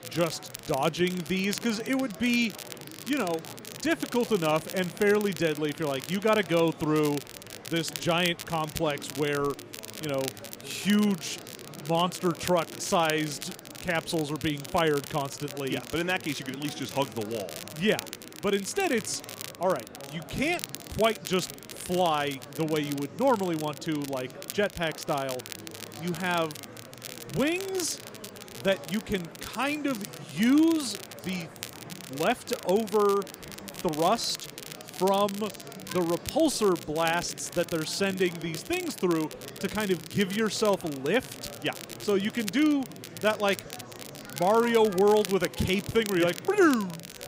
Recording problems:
murmuring crowd; noticeable; throughout; 15 dB below the speech
crackle, like an old record; noticeable; 15 dB below the speech

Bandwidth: 15.5 kHz